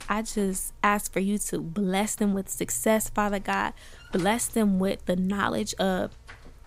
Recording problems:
electrical hum; very faint; throughout; 60 Hz, 25 dB below the speech

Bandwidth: 15.5 kHz